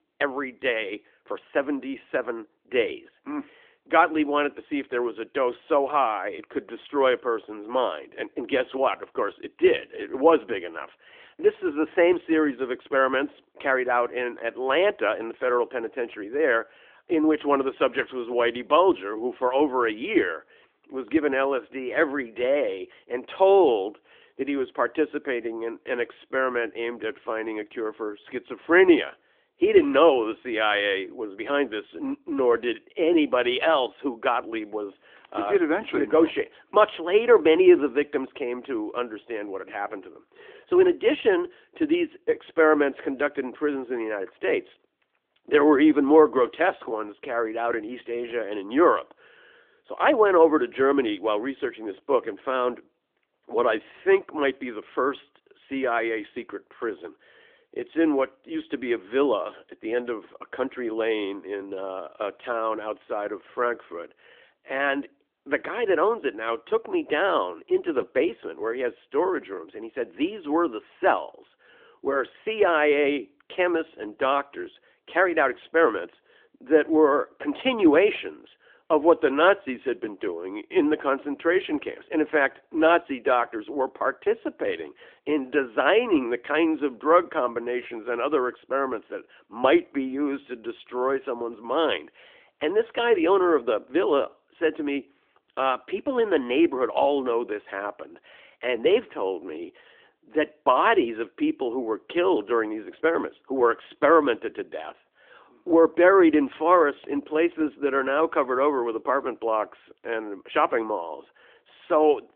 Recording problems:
phone-call audio; nothing above 3.5 kHz

